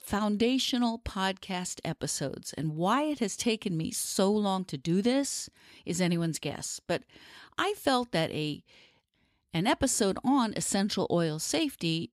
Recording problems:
none

